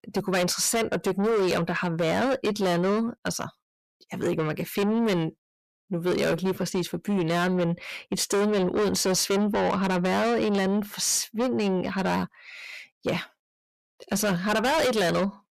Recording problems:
distortion; heavy; 6 dB below the speech

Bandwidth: 14.5 kHz